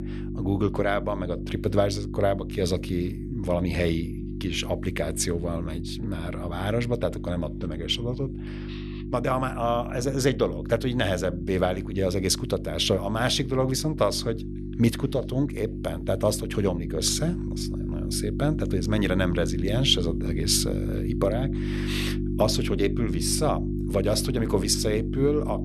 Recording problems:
electrical hum; noticeable; throughout; 50 Hz, 10 dB below the speech

